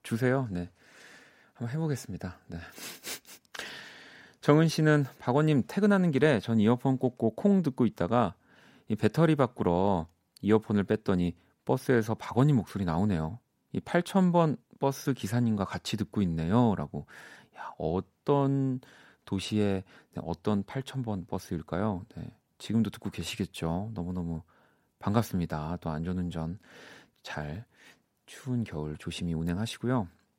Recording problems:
none

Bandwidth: 16 kHz